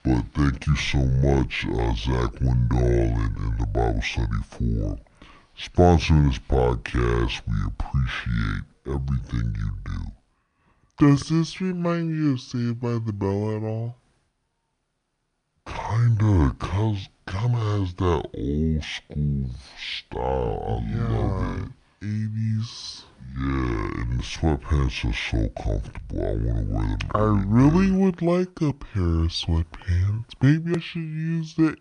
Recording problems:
wrong speed and pitch; too slow and too low; 0.6 times normal speed

